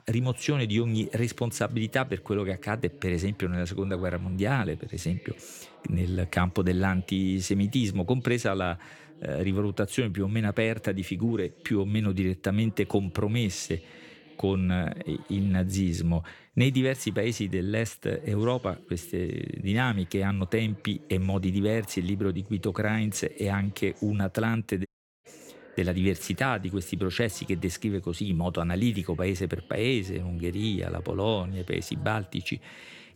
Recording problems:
voice in the background; faint; throughout; 25 dB below the speech
audio cutting out; at 25 s

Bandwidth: 18 kHz